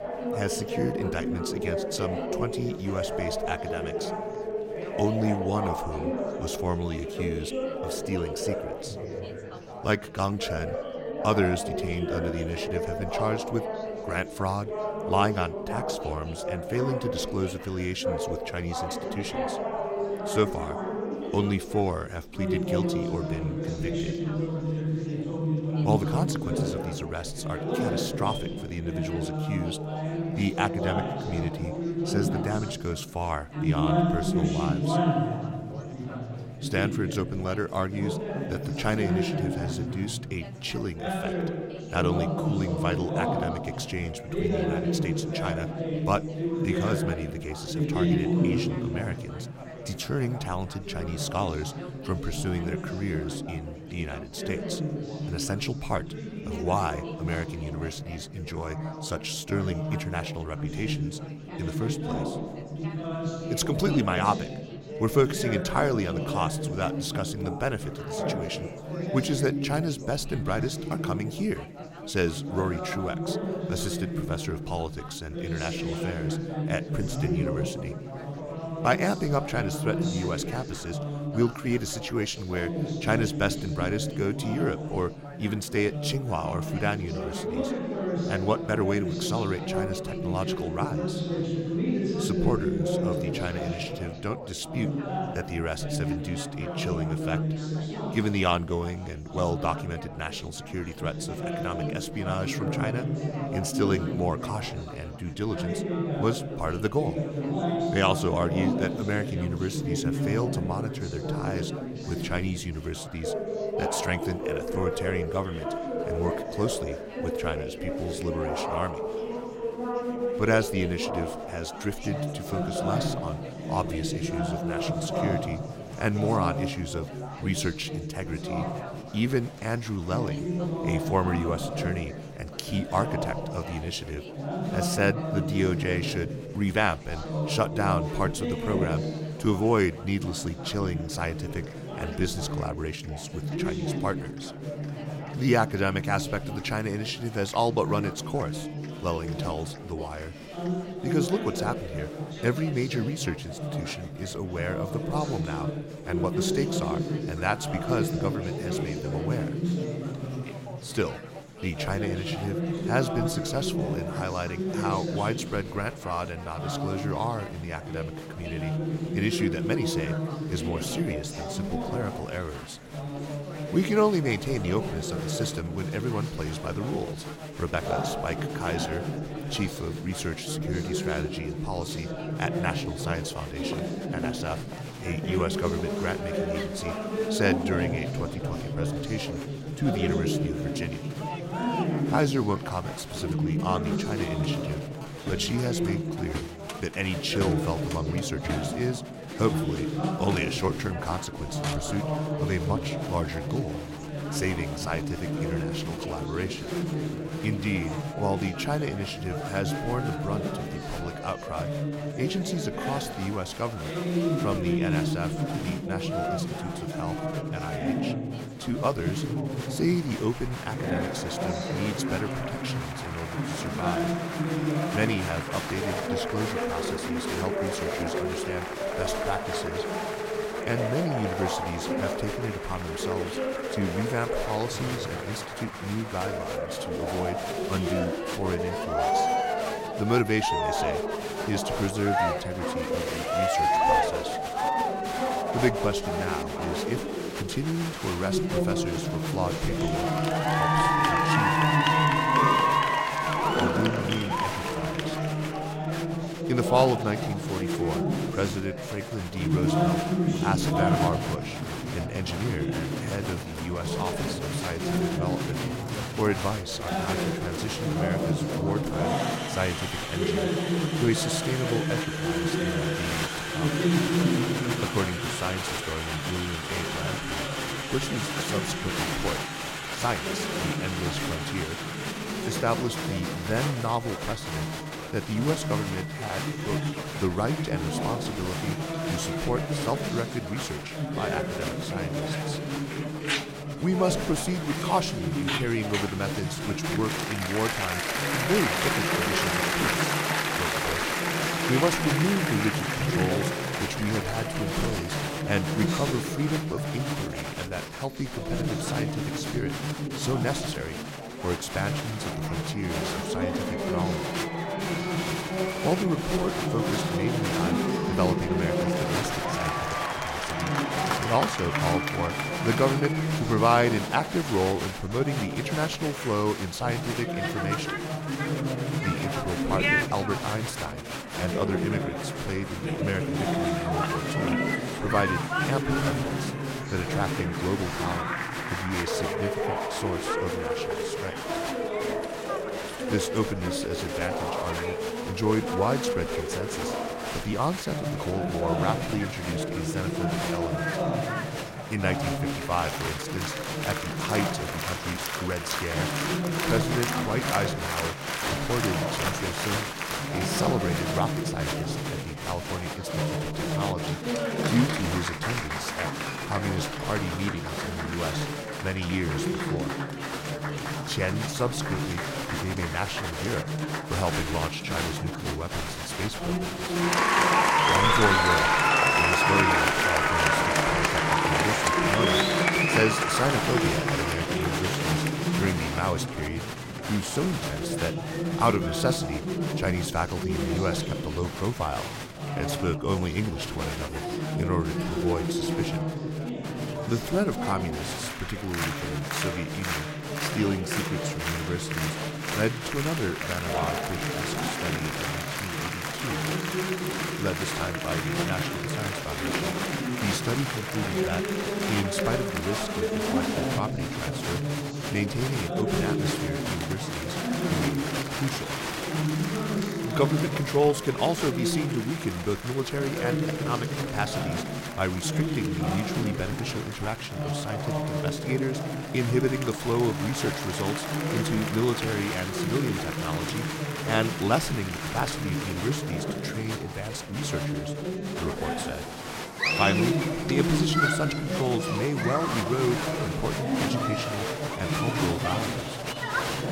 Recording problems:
chatter from many people; very loud; throughout; 1 dB above the speech

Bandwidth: 16 kHz